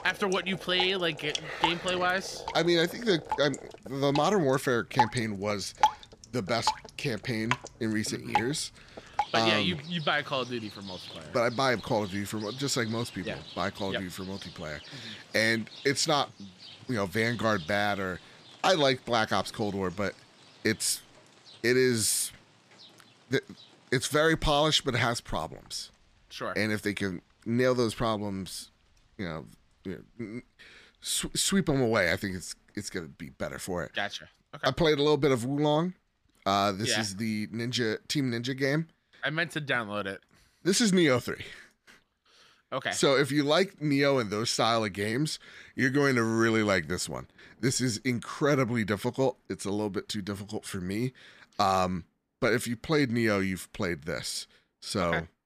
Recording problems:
rain or running water; loud; throughout; 10 dB below the speech

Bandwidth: 14.5 kHz